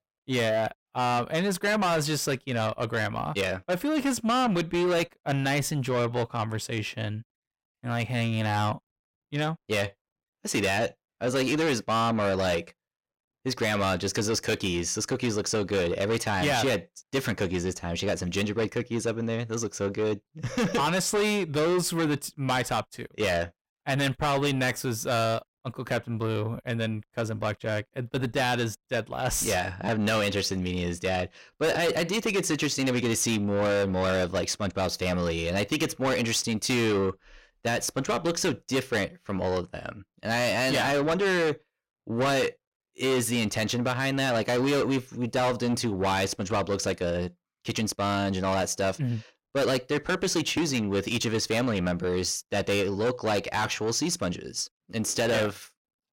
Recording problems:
distortion; heavy; 7 dB below the speech

